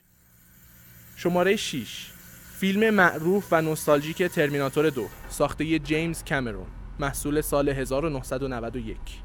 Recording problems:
traffic noise; noticeable; throughout; 20 dB below the speech

